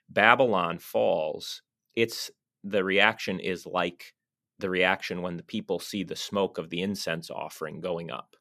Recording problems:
none

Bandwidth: 14.5 kHz